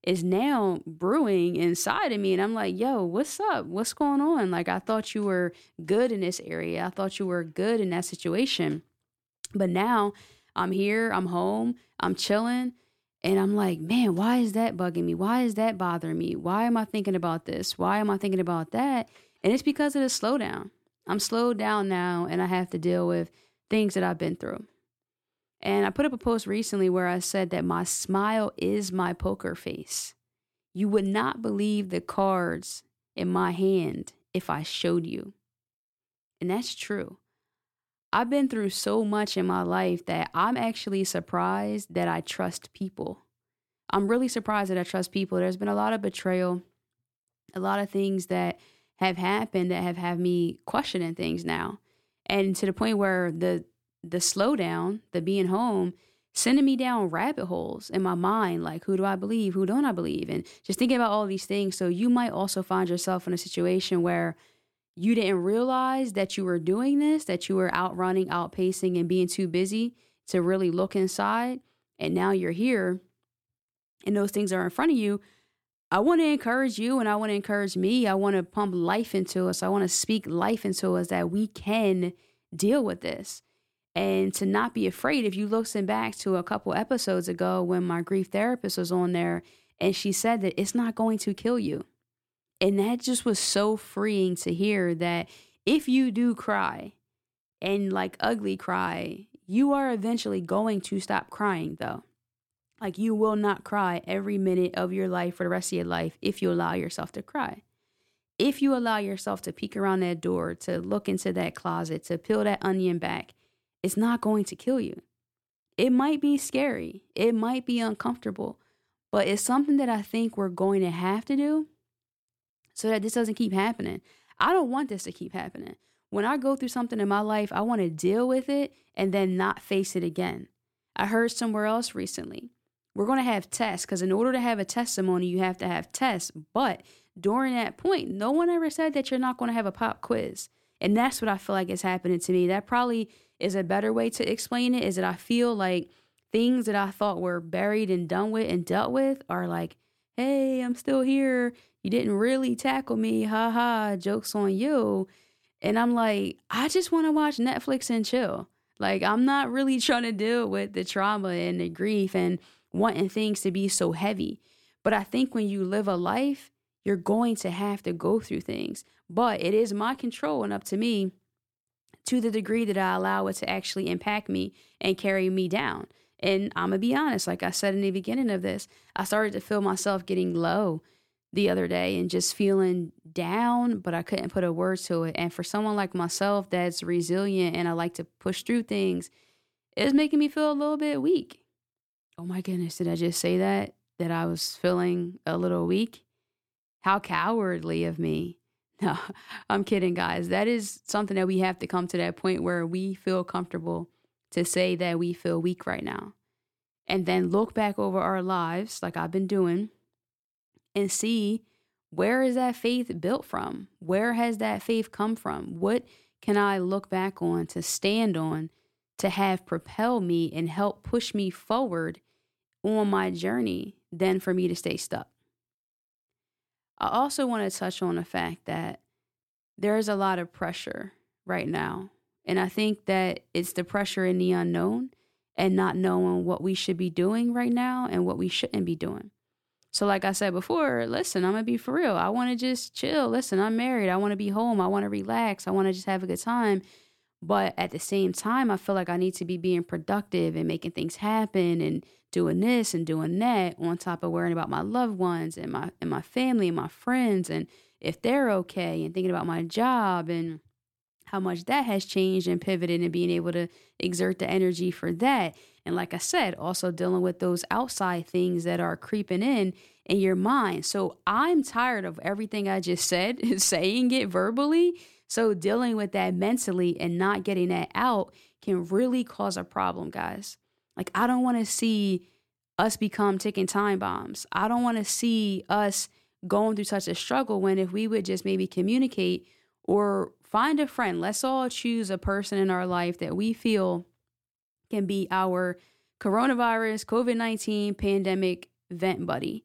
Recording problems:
none

